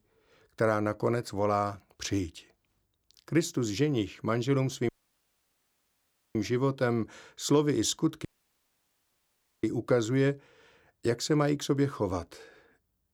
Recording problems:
audio cutting out; at 5 s for 1.5 s and at 8.5 s for 1.5 s

